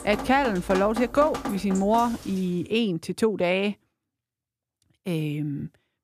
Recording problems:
rain or running water; very faint; until 2 s; 10 dB below the speech

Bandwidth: 14.5 kHz